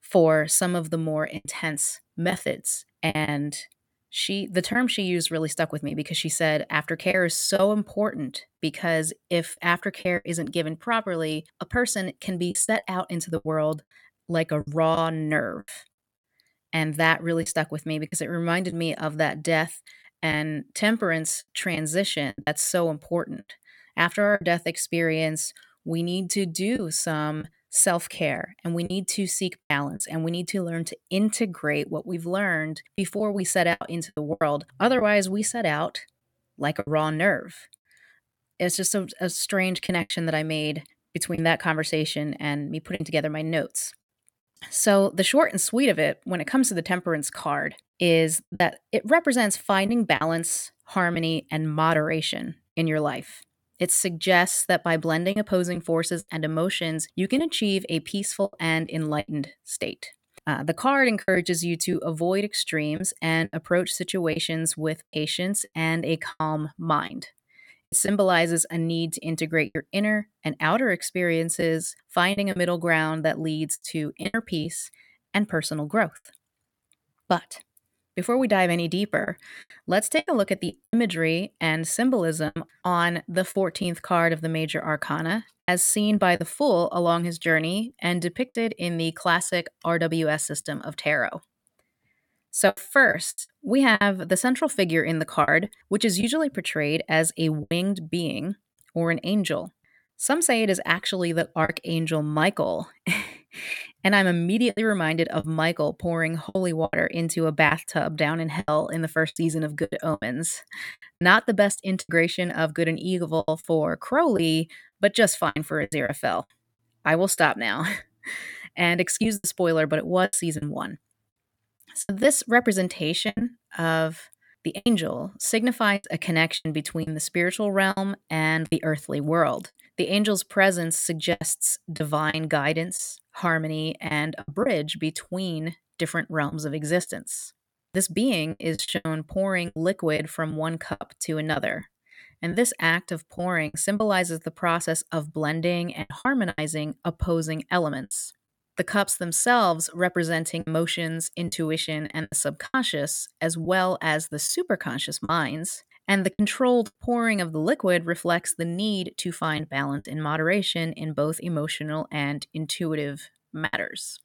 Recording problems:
choppy; very; 6% of the speech affected

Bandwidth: 18 kHz